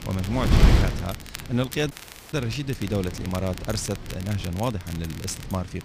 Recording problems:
wind noise on the microphone; heavy; 3 dB below the speech
crackle, like an old record; noticeable; 15 dB below the speech
audio cutting out; at 2 s

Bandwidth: 15 kHz